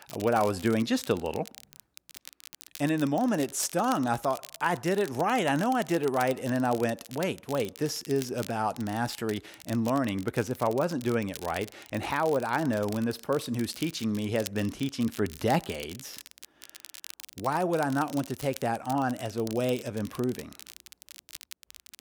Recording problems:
crackle, like an old record; noticeable; 15 dB below the speech

